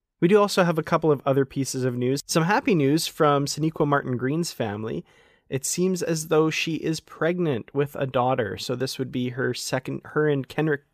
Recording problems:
none

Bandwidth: 15 kHz